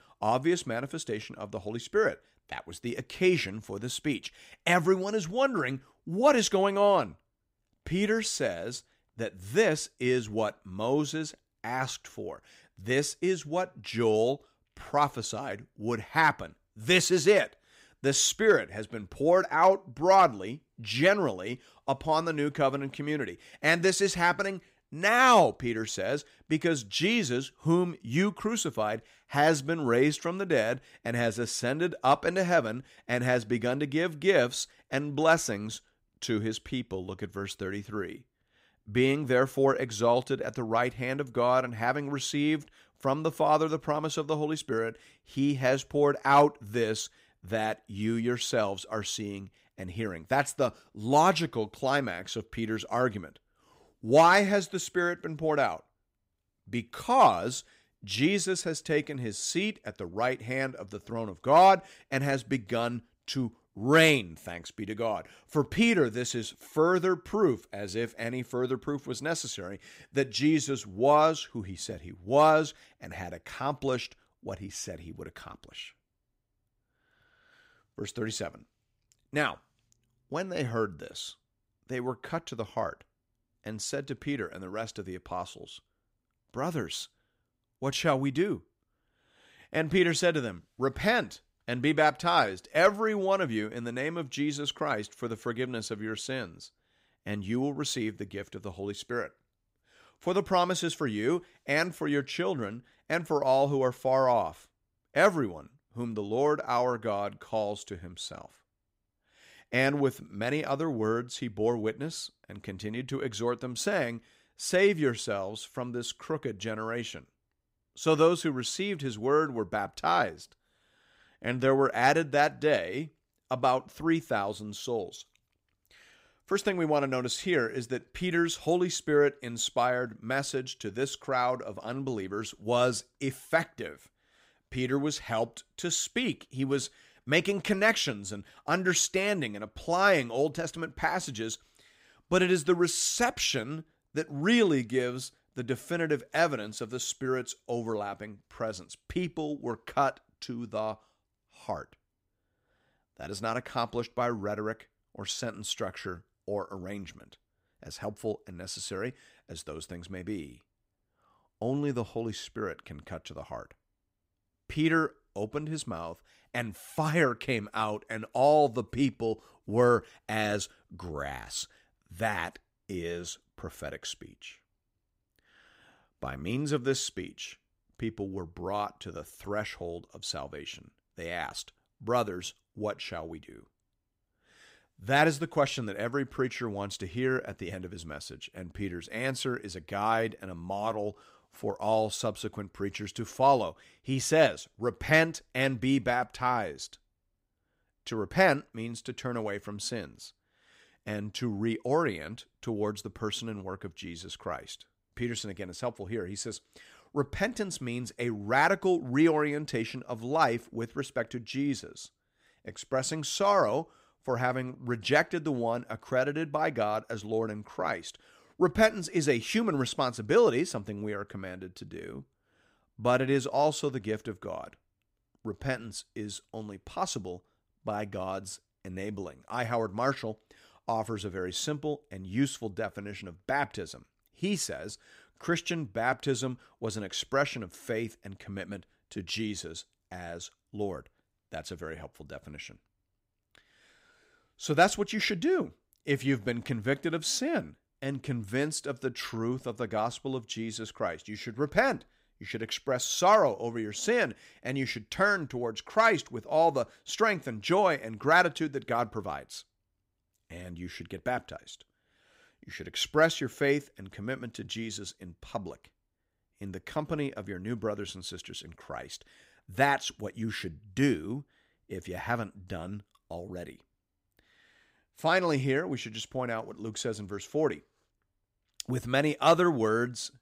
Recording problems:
none

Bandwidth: 15.5 kHz